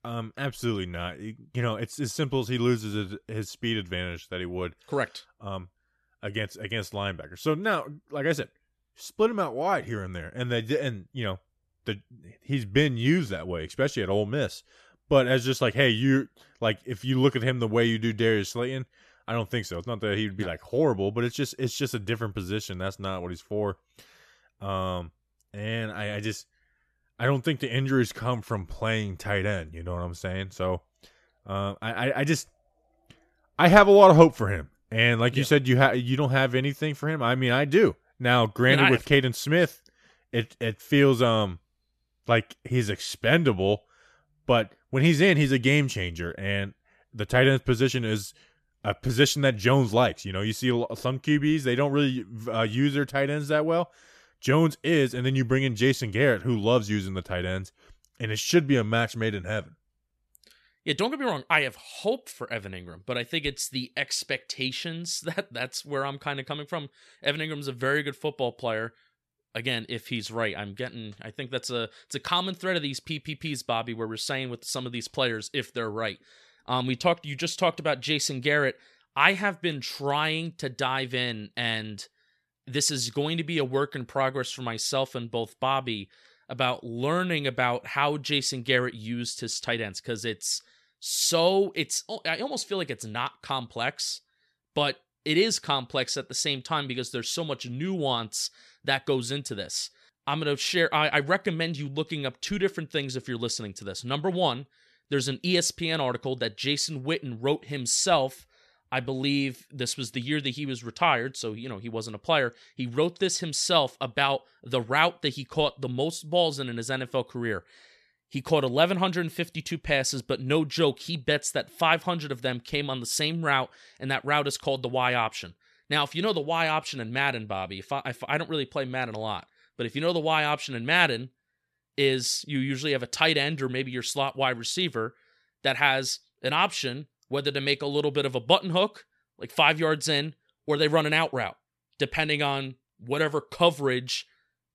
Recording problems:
none

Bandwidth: 14 kHz